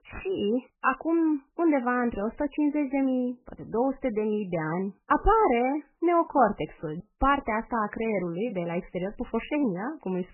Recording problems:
garbled, watery; badly; nothing above 3 kHz

